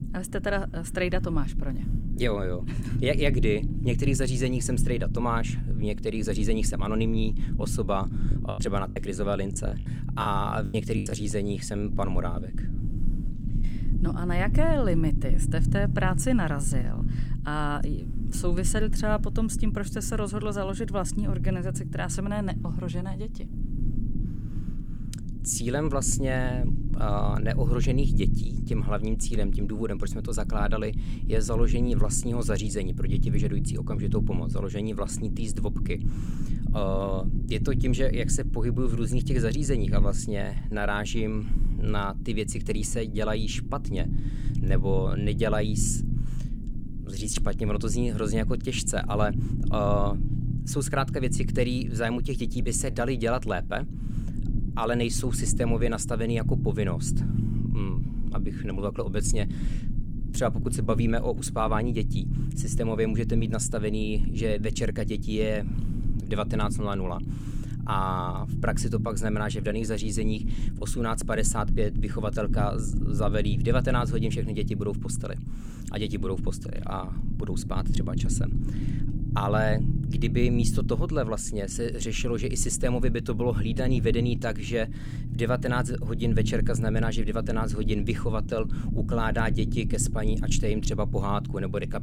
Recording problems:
low rumble; noticeable; throughout; 10 dB below the speech
choppy; very; from 8.5 to 11 s; 14% of the speech affected

